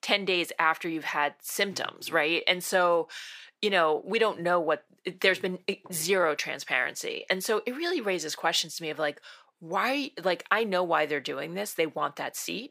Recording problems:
thin; somewhat; fading below 300 Hz

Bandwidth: 15 kHz